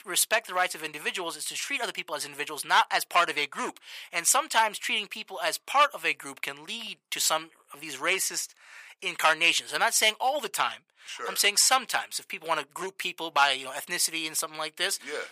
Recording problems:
thin; very; fading below 950 Hz

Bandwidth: 15 kHz